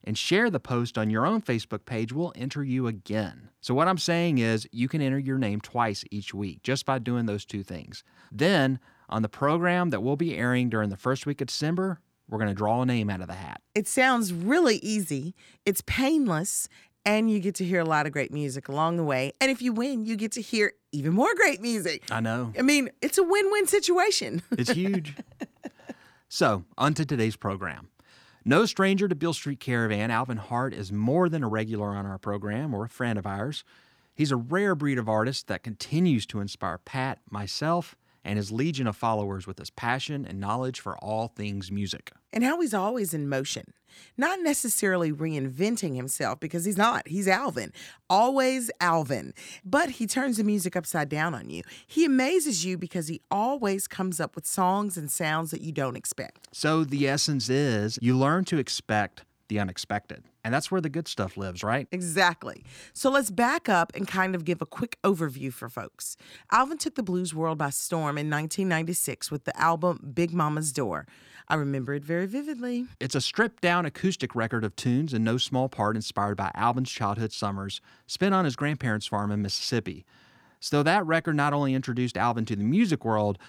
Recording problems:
none

